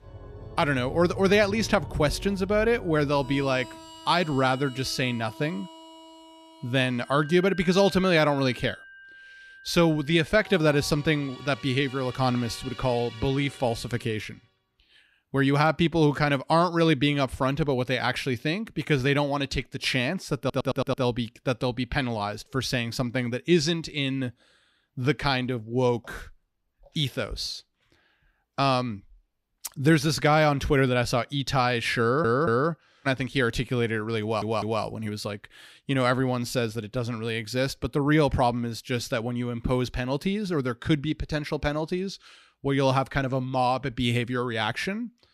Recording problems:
background music; noticeable; until 14 s; 15 dB below the speech
audio stuttering; at 20 s, at 32 s and at 34 s

